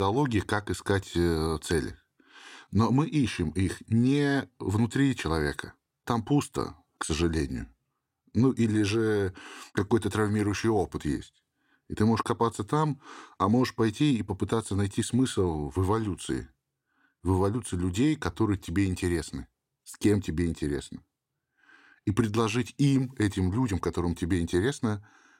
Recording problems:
abrupt cut into speech; at the start

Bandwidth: 16 kHz